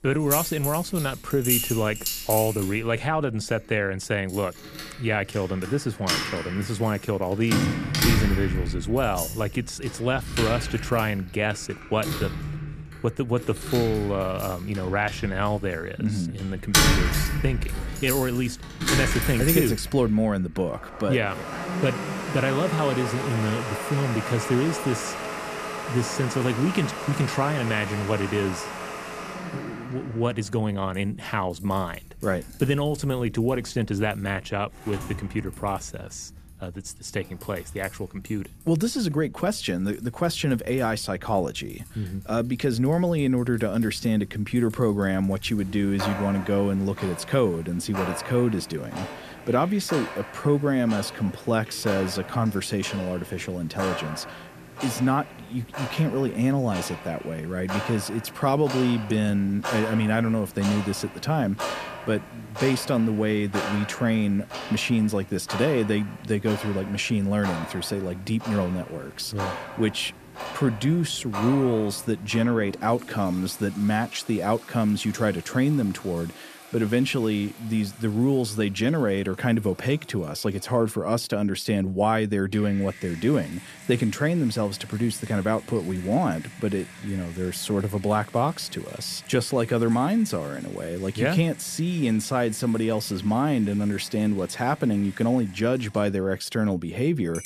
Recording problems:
household noises; loud; throughout; 6 dB below the speech

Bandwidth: 14.5 kHz